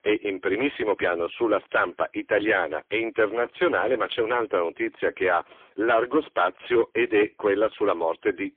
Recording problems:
phone-call audio; poor line; nothing above 3.5 kHz
distortion; slight; 9% of the sound clipped

